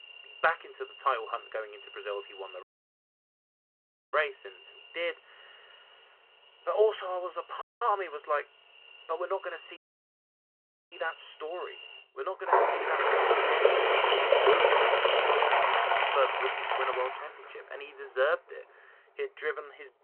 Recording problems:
phone-call audio
animal sounds; very loud; throughout; 8 dB above the speech
audio cutting out; at 2.5 s for 1.5 s, at 7.5 s and at 10 s for 1 s

